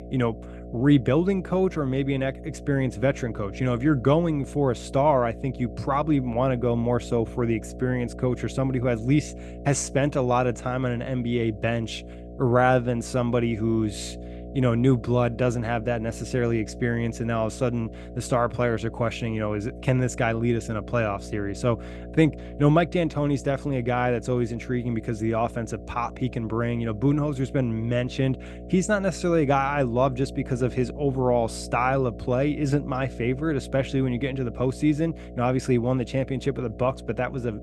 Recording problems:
electrical hum; noticeable; throughout; 60 Hz, 15 dB below the speech

